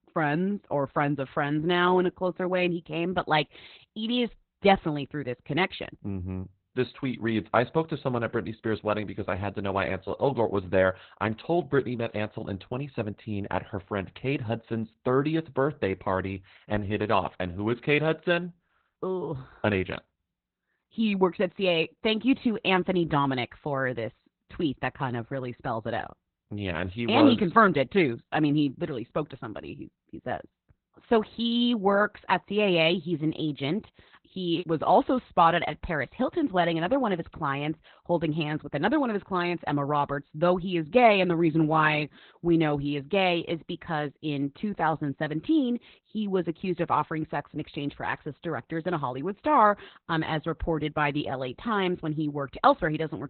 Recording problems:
garbled, watery; badly; nothing above 4 kHz

